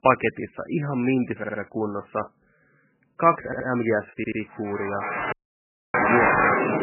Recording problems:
garbled, watery; badly; nothing above 2.5 kHz
crowd noise; very loud; from 5.5 s on; 4 dB above the speech
audio stuttering; at 1.5 s, at 3.5 s and at 4 s
audio cutting out; at 5.5 s for 0.5 s

